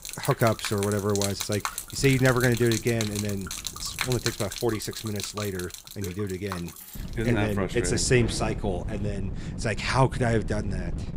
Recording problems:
rain or running water; loud; throughout; 7 dB below the speech
wind noise on the microphone; occasional gusts; from 2 to 4.5 s and from 7 s on; 20 dB below the speech
jangling keys; faint; at 6.5 s; peak 15 dB below the speech

